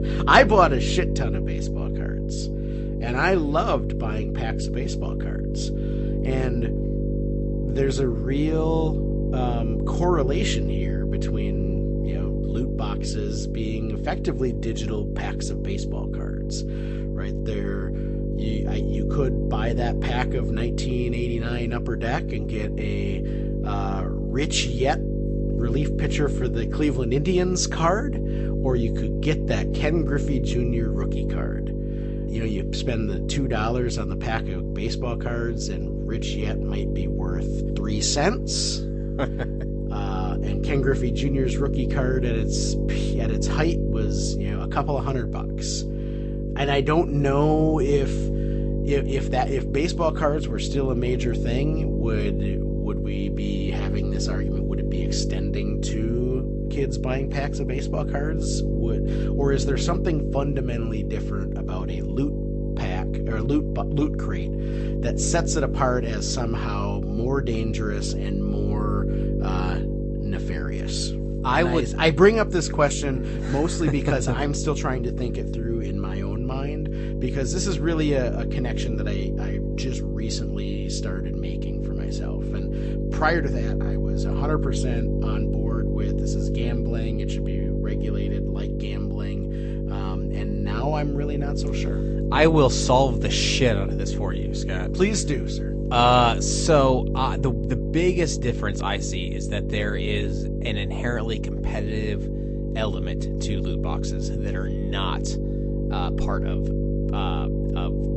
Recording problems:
garbled, watery; slightly; nothing above 8 kHz
electrical hum; loud; throughout; 50 Hz, 7 dB below the speech

